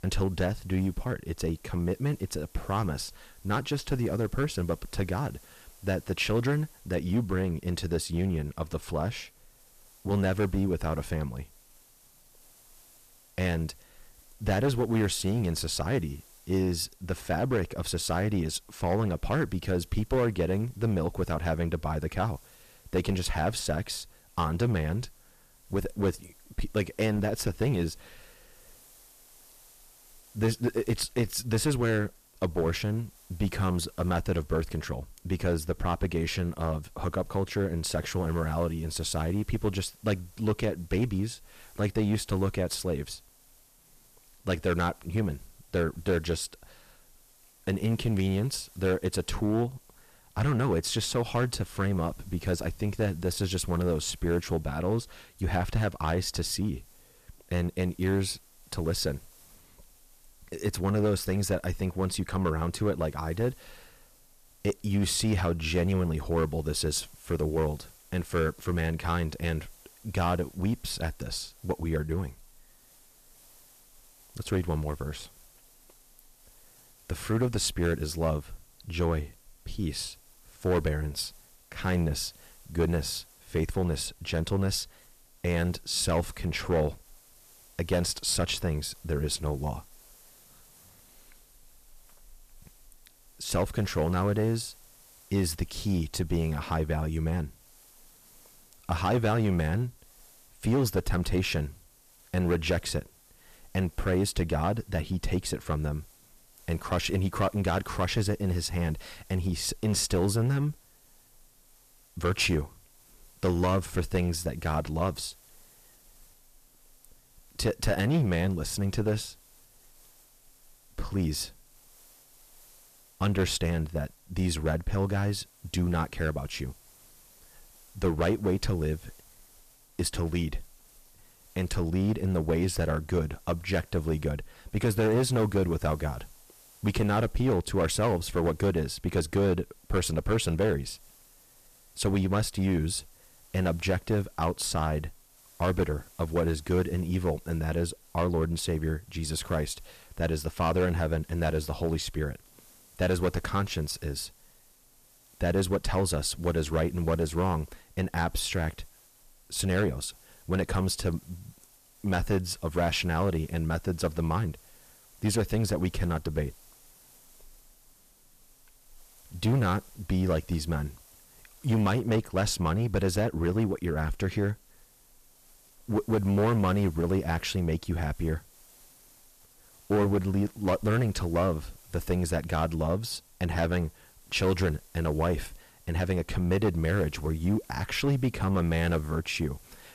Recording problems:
distortion; slight; 5% of the sound clipped
hiss; faint; throughout; 25 dB below the speech

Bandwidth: 14.5 kHz